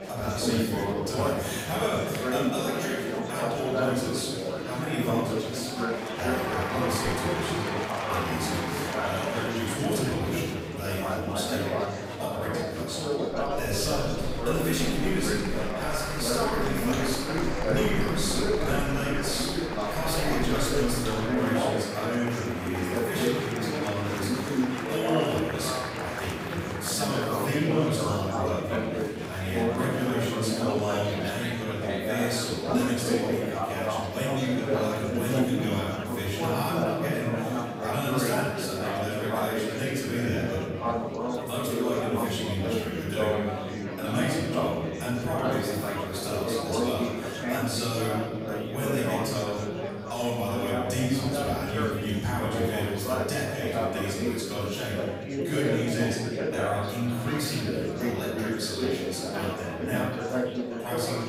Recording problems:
room echo; strong; dies away in 1.6 s
off-mic speech; far
chatter from many people; loud; throughout; 1 dB below the speech
keyboard typing; noticeable; from 13 to 21 s; peak 7 dB below the speech

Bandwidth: 15.5 kHz